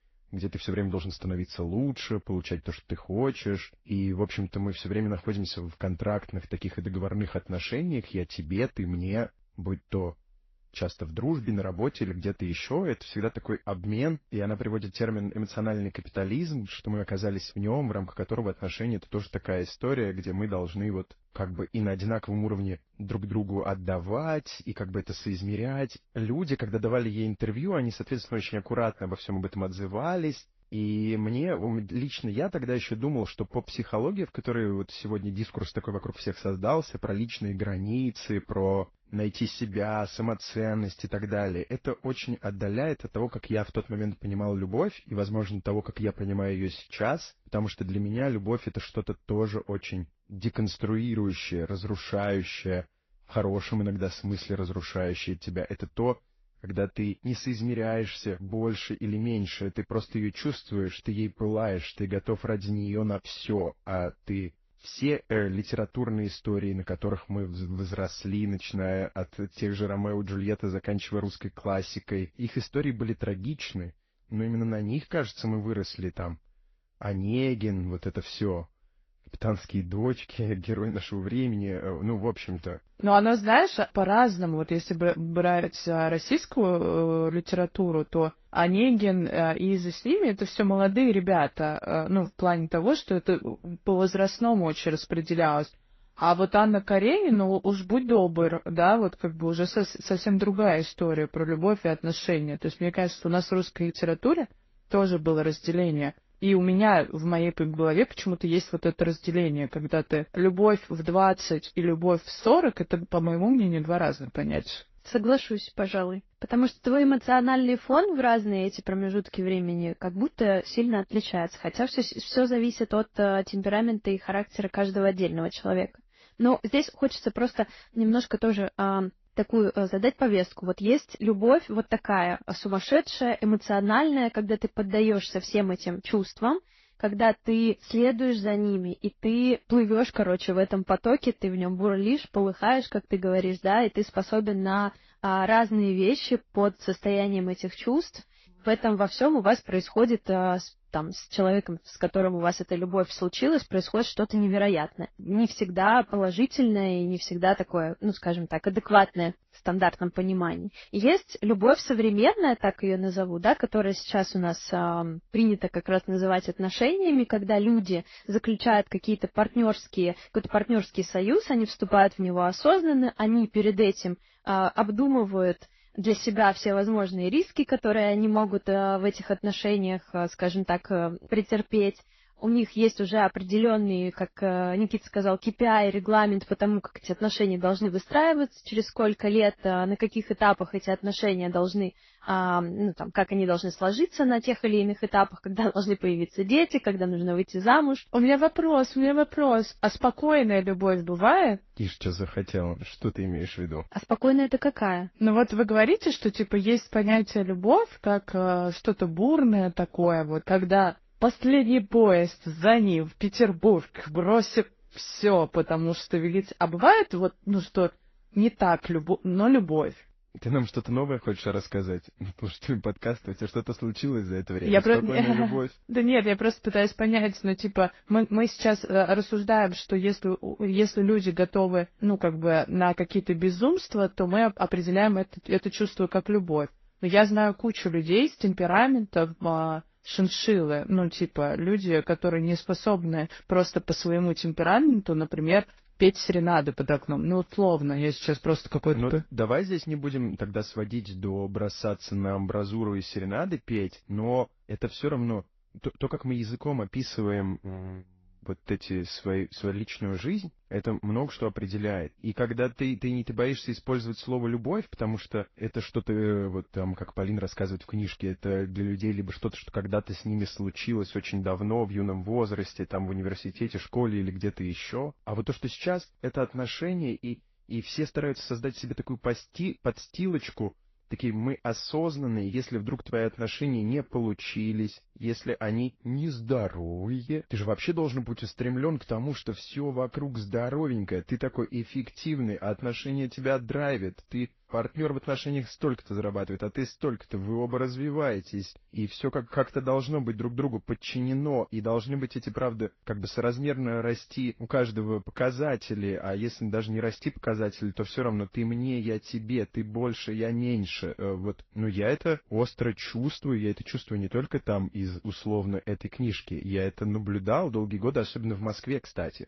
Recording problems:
garbled, watery; slightly; nothing above 6 kHz

